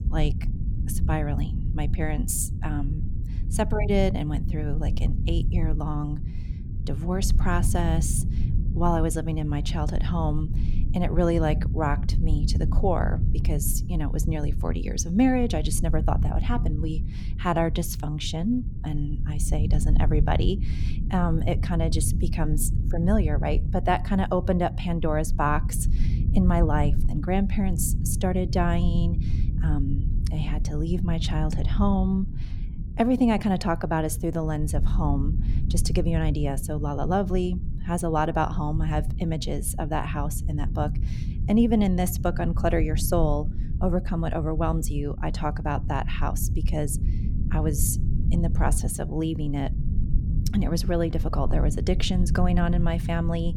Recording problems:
low rumble; noticeable; throughout; 15 dB below the speech

